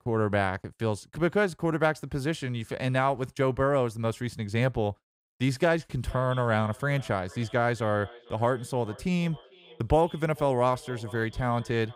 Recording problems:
echo of what is said; faint; from 6 s on; 440 ms later, 20 dB below the speech

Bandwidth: 15.5 kHz